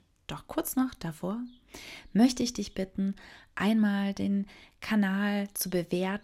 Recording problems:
none

